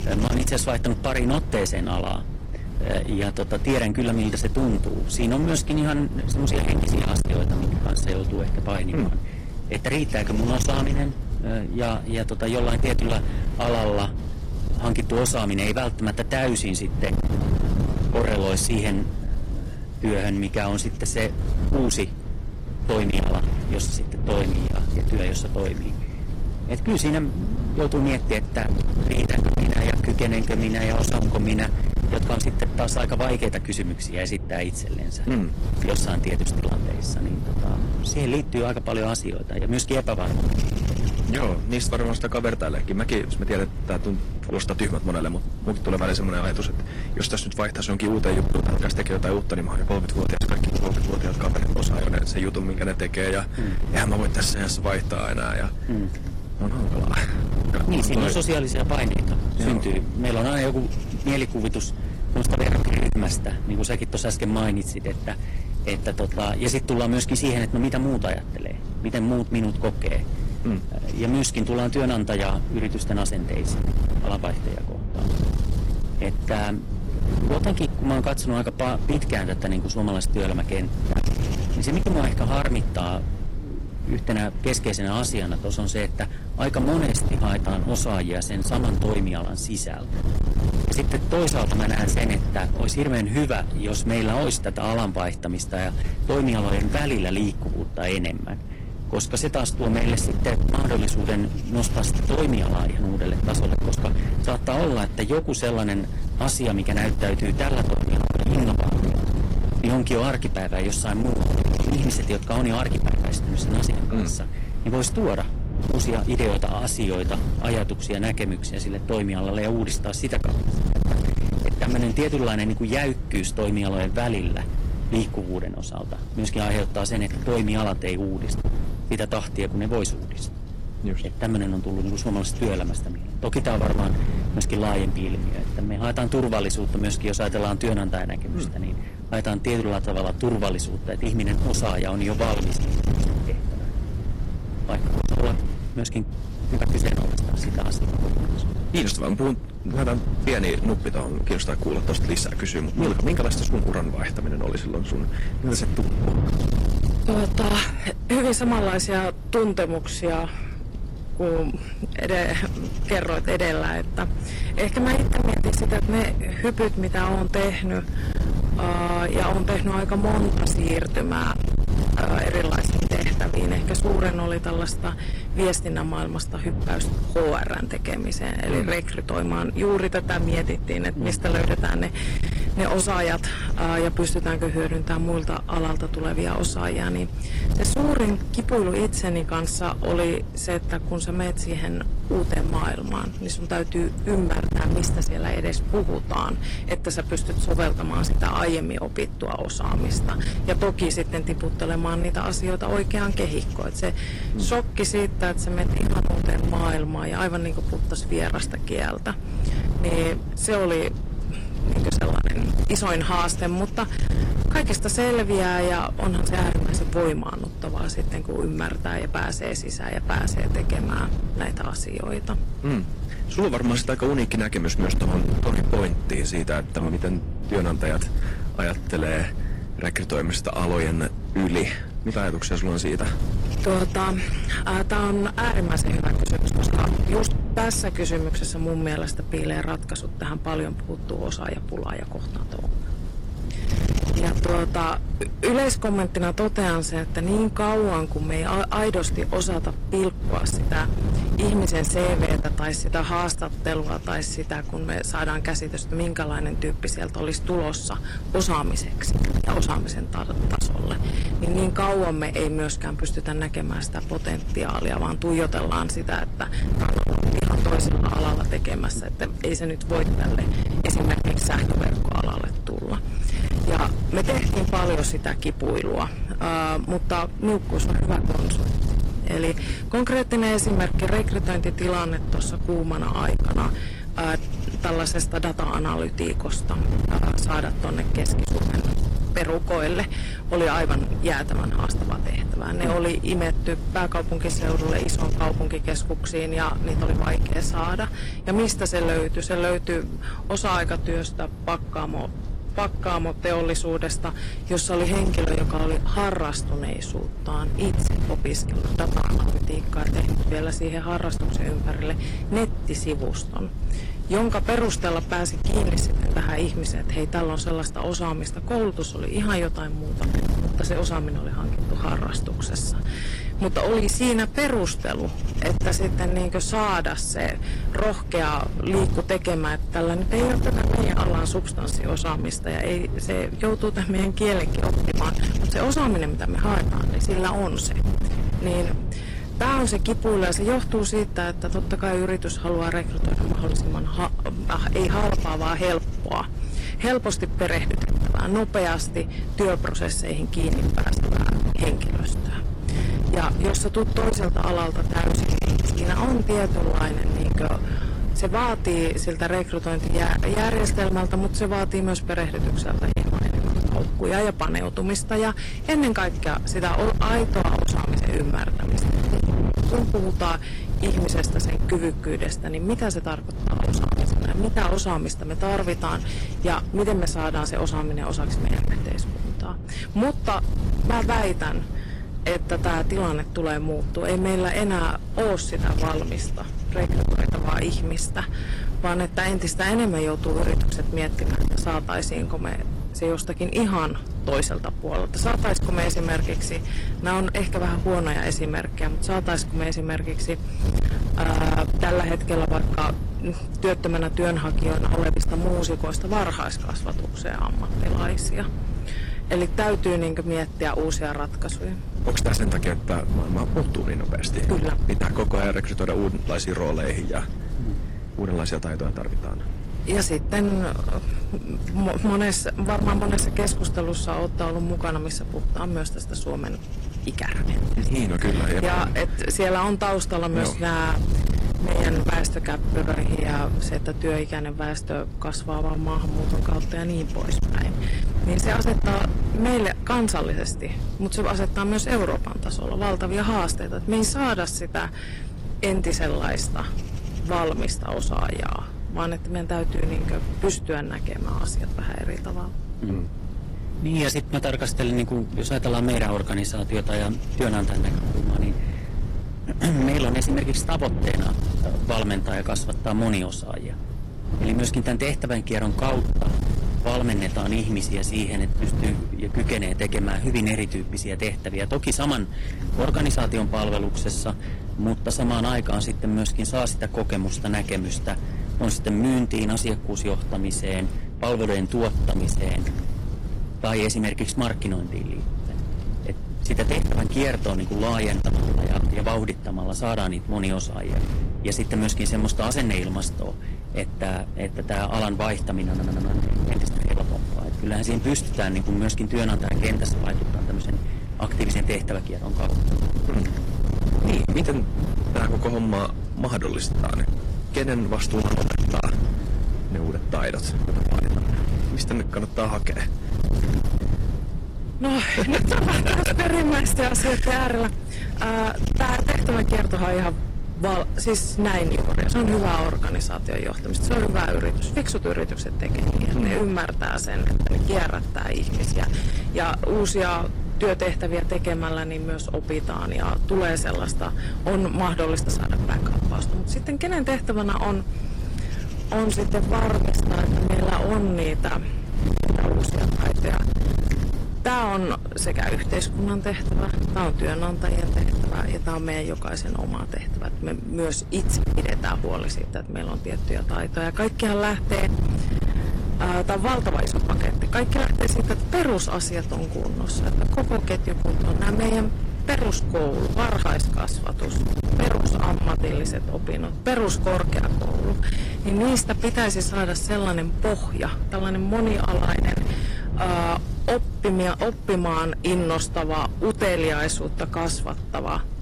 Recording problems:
distortion; heavy; 17% of the sound clipped
garbled, watery; slightly; nothing above 16.5 kHz
wind noise on the microphone; heavy; 9 dB below the speech
audio stuttering; at 8:16

